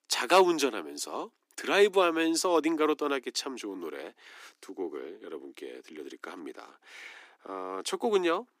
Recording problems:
thin; very; fading below 300 Hz

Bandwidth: 15 kHz